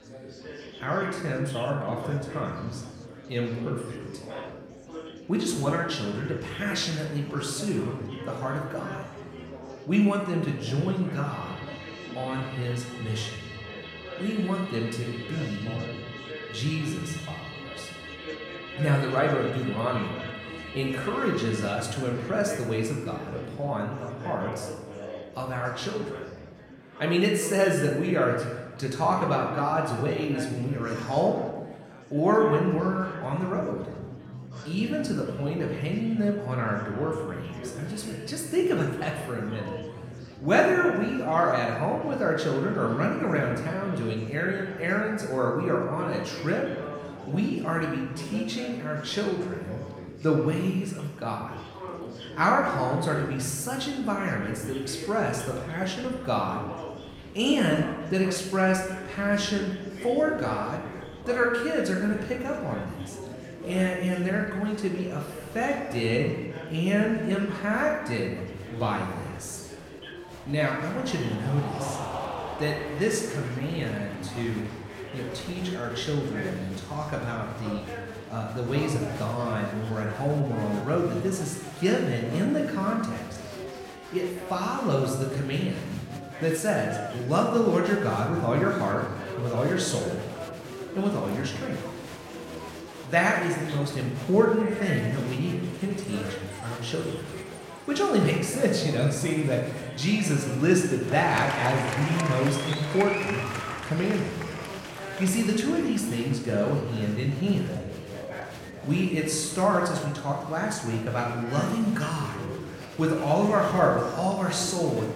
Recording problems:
room echo; noticeable; dies away in 1 s
off-mic speech; somewhat distant
background music; noticeable; throughout; 20 dB below the speech
murmuring crowd; noticeable; throughout; 10 dB below the speech

